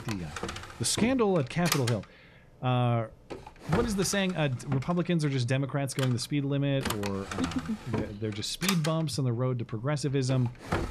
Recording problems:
household noises; loud; throughout; 7 dB below the speech

